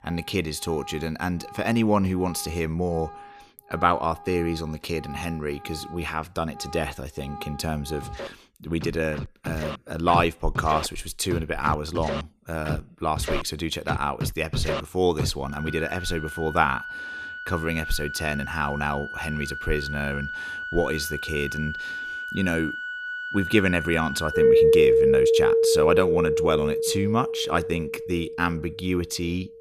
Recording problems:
background music; very loud; throughout; as loud as the speech

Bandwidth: 14.5 kHz